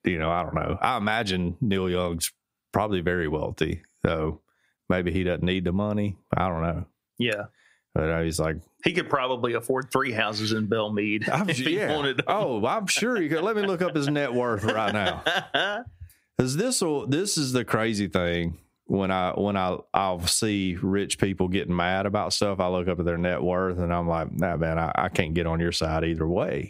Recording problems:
squashed, flat; somewhat

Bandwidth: 15.5 kHz